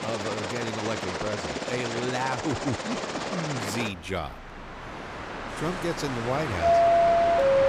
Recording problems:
train or aircraft noise; very loud; throughout; 5 dB above the speech

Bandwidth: 15.5 kHz